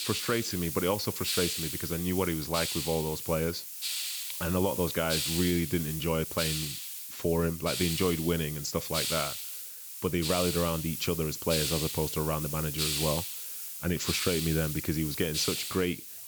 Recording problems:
high frequencies cut off; noticeable; nothing above 7.5 kHz
hiss; loud; throughout; 2 dB below the speech

